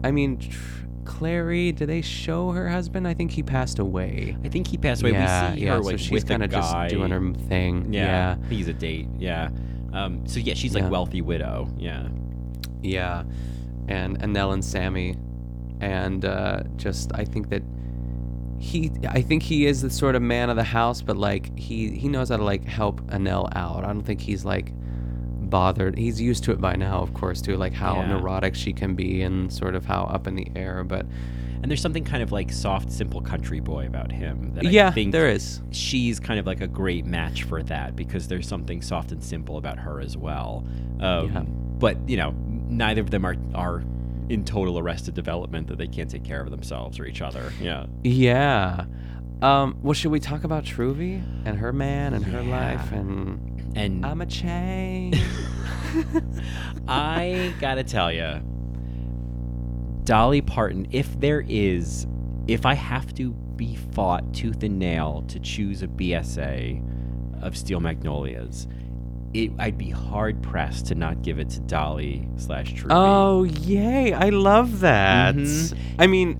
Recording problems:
electrical hum; noticeable; throughout; 60 Hz, 20 dB below the speech

